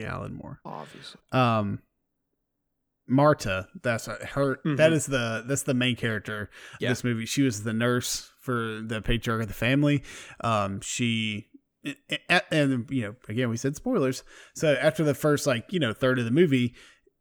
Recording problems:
abrupt cut into speech; at the start

